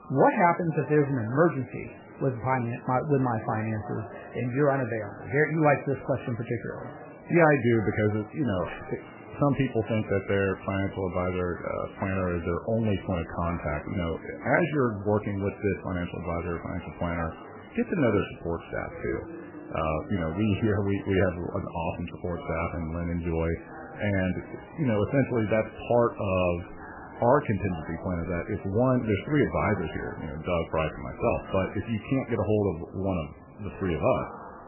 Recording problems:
garbled, watery; badly; nothing above 3 kHz
murmuring crowd; noticeable; throughout; 15 dB below the speech

